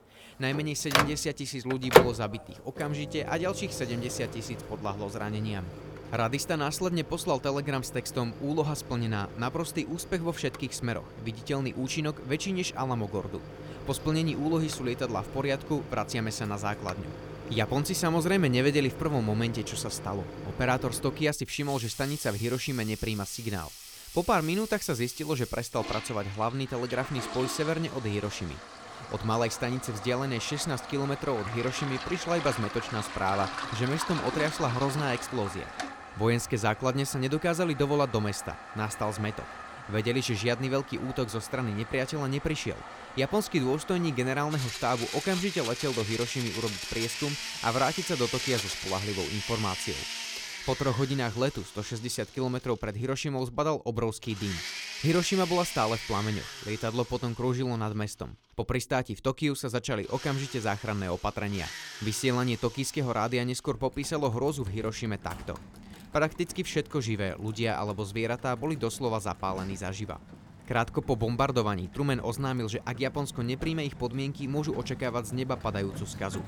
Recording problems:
household noises; loud; throughout; 6 dB below the speech

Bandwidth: 19 kHz